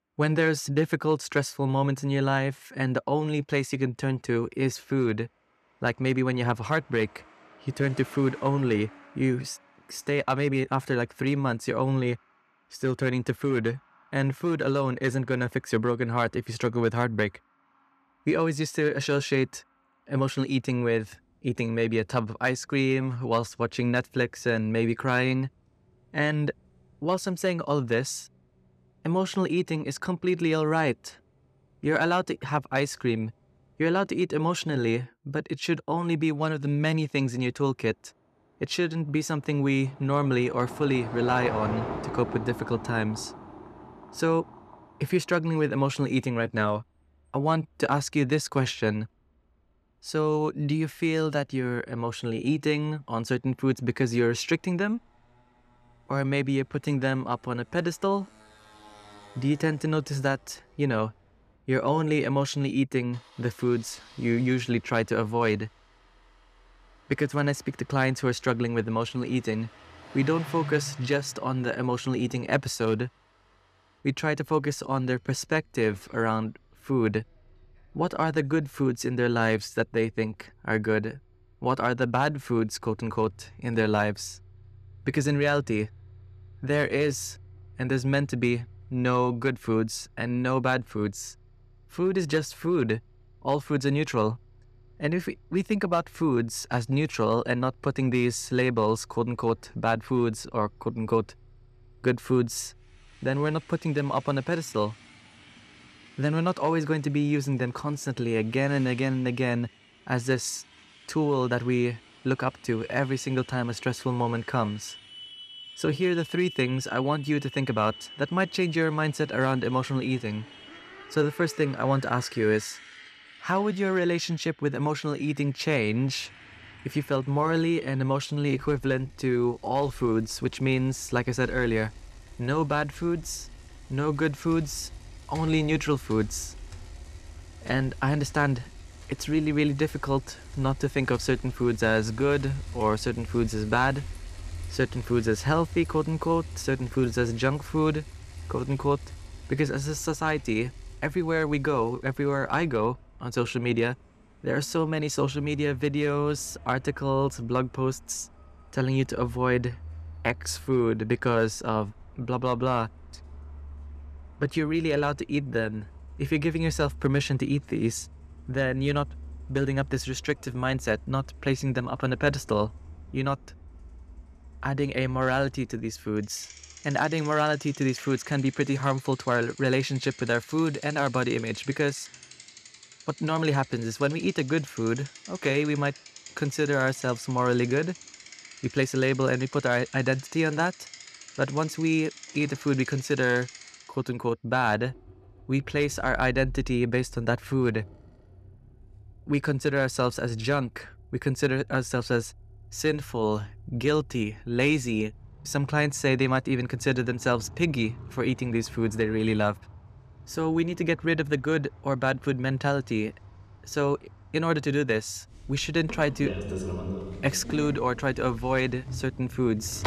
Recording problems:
traffic noise; noticeable; throughout; 15 dB below the speech

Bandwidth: 14.5 kHz